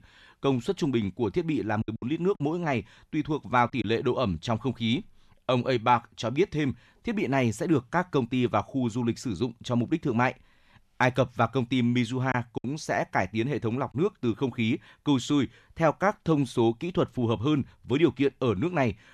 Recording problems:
choppy; very; from 2 to 4 s and at 12 s; 5% of the speech affected

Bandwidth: 13.5 kHz